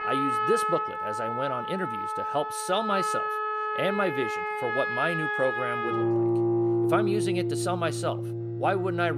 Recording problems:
background music; very loud; throughout; 2 dB above the speech
abrupt cut into speech; at the end

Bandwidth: 14.5 kHz